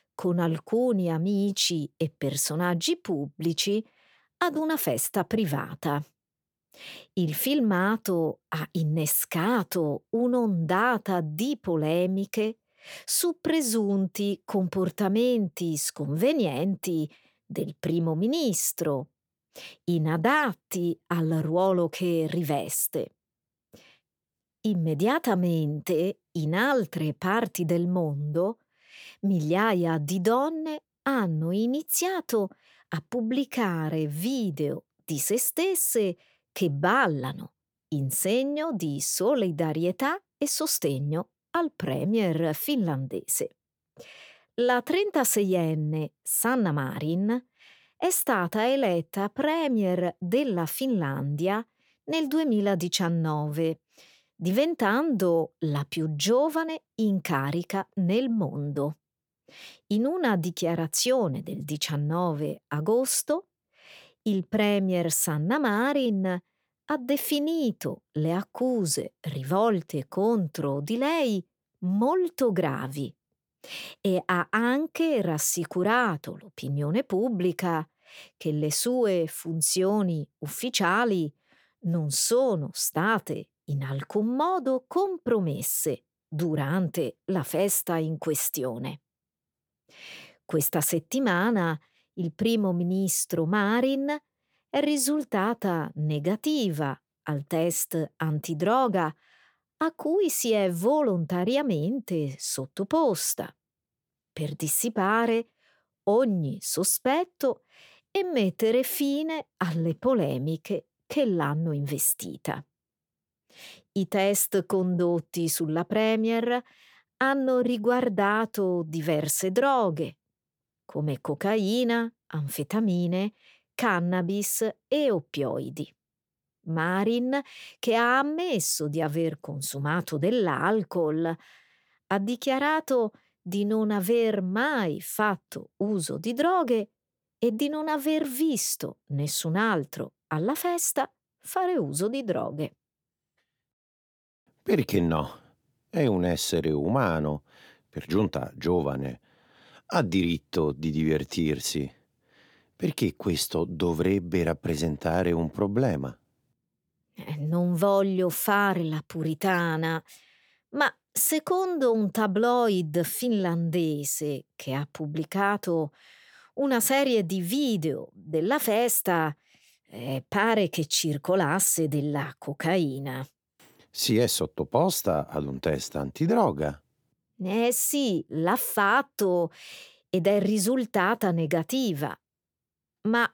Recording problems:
none

